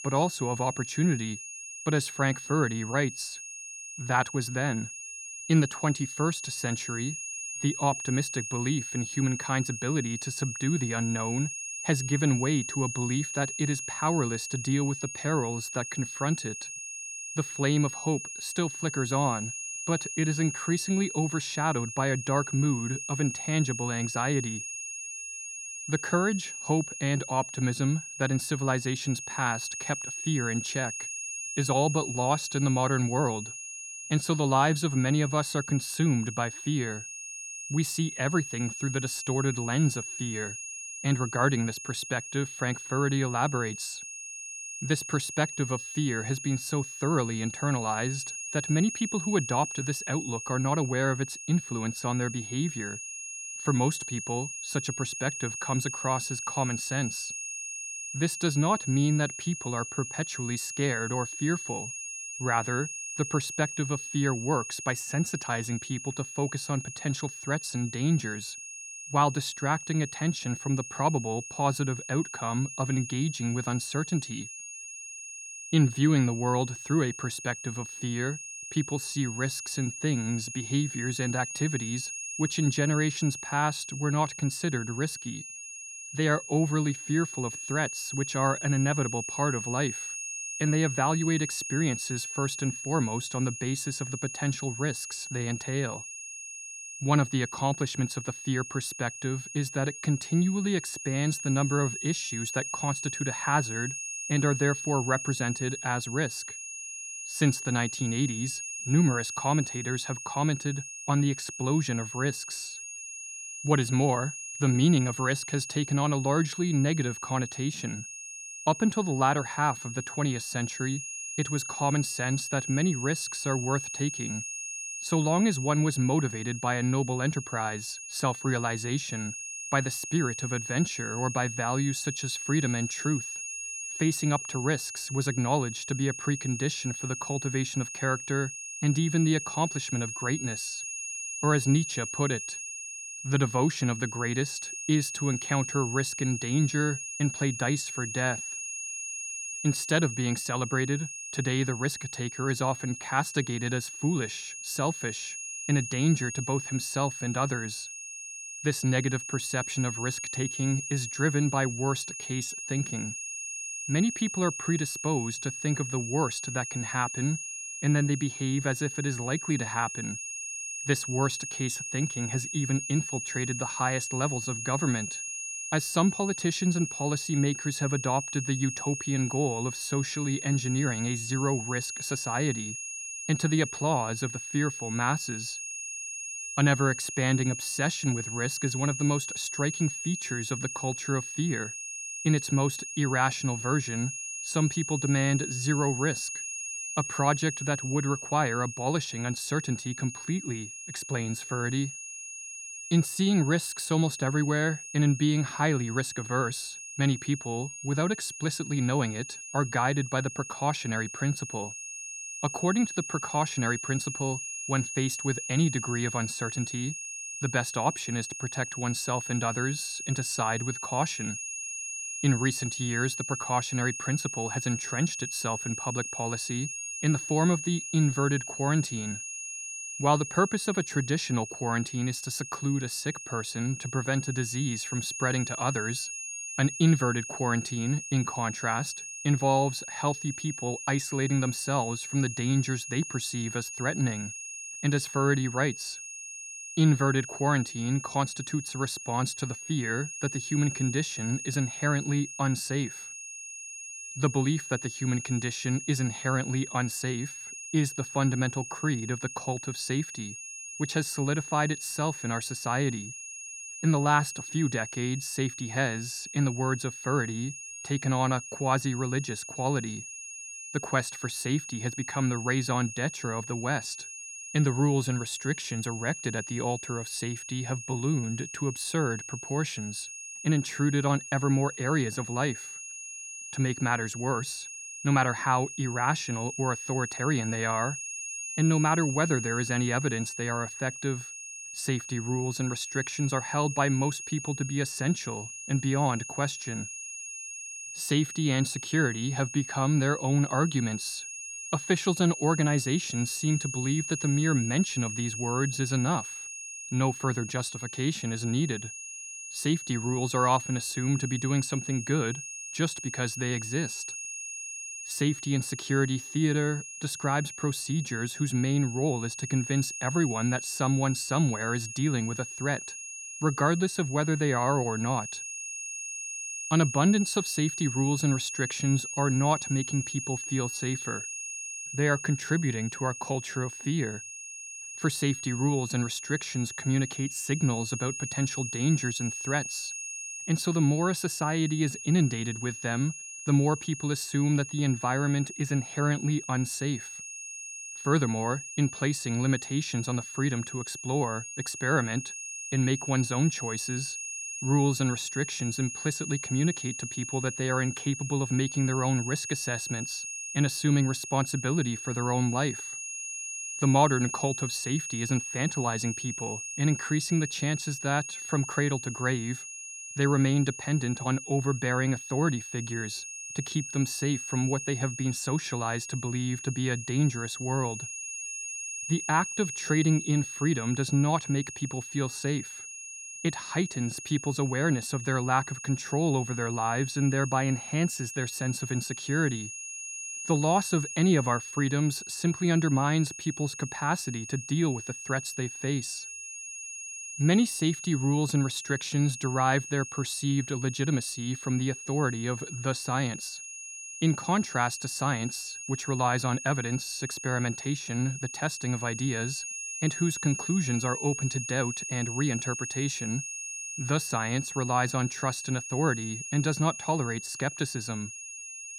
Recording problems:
high-pitched whine; loud; throughout; 6.5 kHz, 7 dB below the speech

